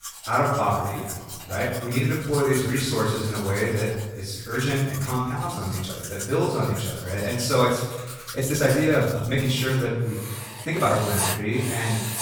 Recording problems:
room echo; strong; dies away in 1 s
off-mic speech; far
household noises; loud; throughout; 10 dB below the speech
uneven, jittery; strongly; from 0.5 to 11 s

